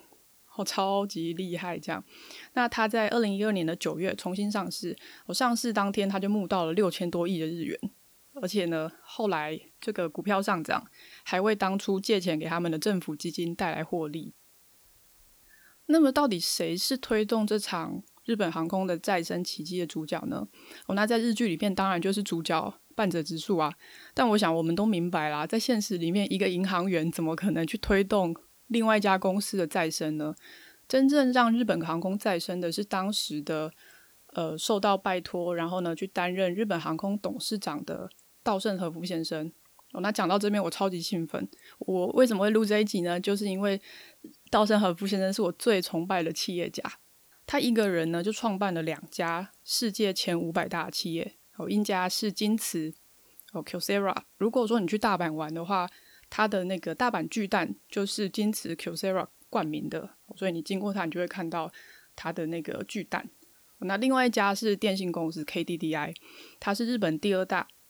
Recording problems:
hiss; faint; throughout; 30 dB below the speech

